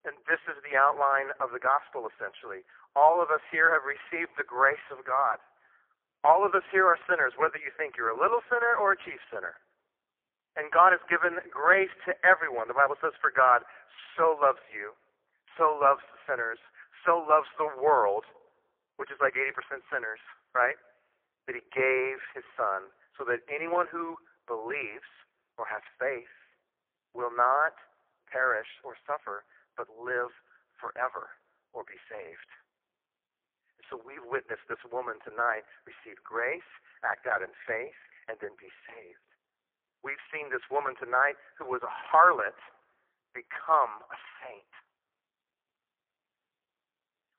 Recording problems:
phone-call audio; poor line

